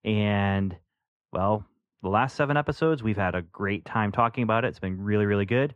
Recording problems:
muffled; very; fading above 3.5 kHz

